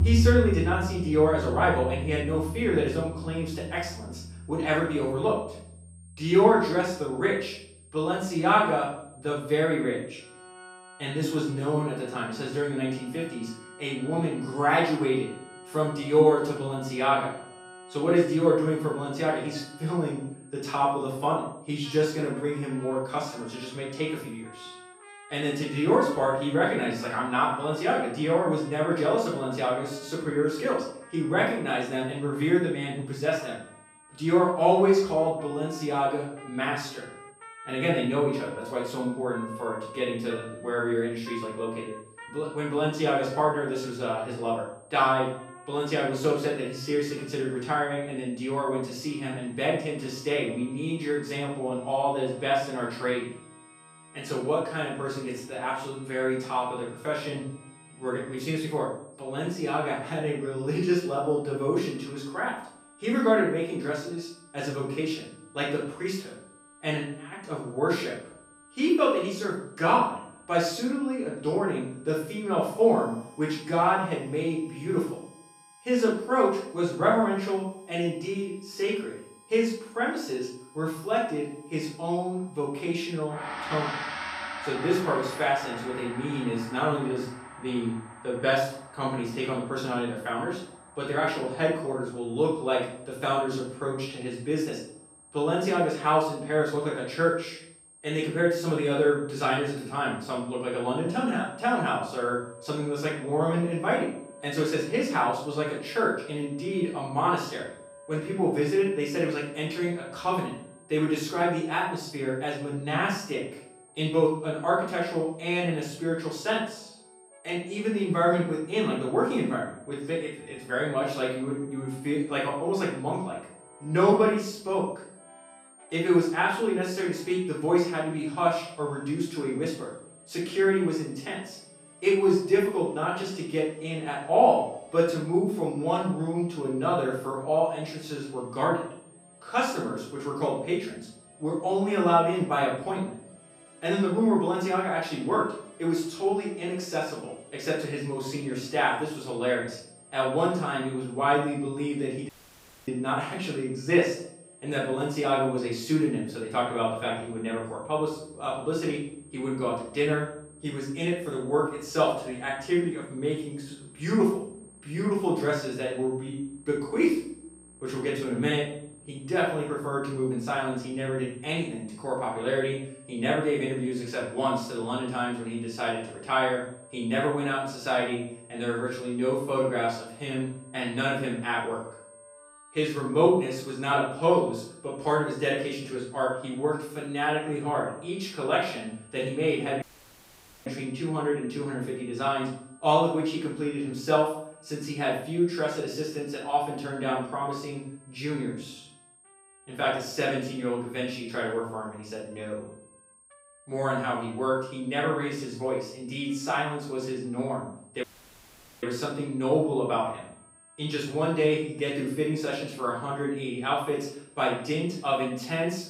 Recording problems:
off-mic speech; far
room echo; noticeable; dies away in 0.5 s
background music; noticeable; throughout; 15 dB below the speech
high-pitched whine; faint; throughout; 8.5 kHz, 25 dB below the speech
audio cutting out; at 2:32 for 0.5 s, at 3:10 for 1 s and at 3:28 for 1 s

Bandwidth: 15.5 kHz